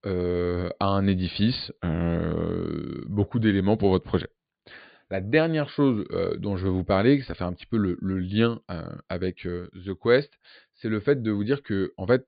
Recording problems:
high frequencies cut off; severe; nothing above 4.5 kHz

